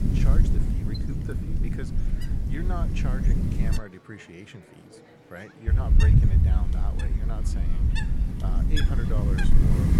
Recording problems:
wind noise on the microphone; heavy; until 4 s and from 5.5 s on; 4 dB above the speech
train or aircraft noise; noticeable; throughout; 15 dB below the speech
murmuring crowd; noticeable; throughout; 15 dB below the speech

